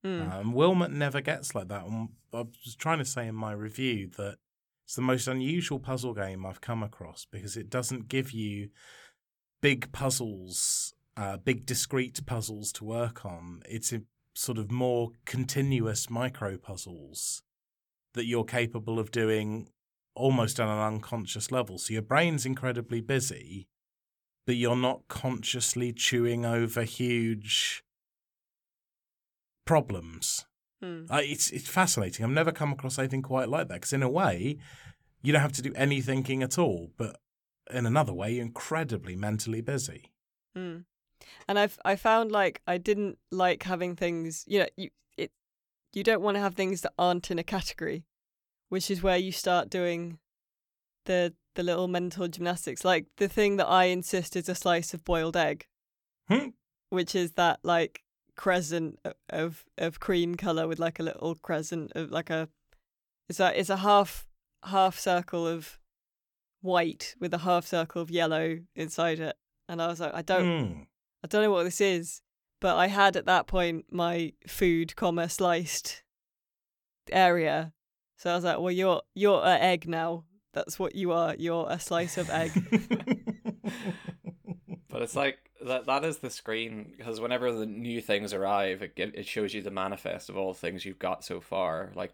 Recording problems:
none

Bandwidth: 18.5 kHz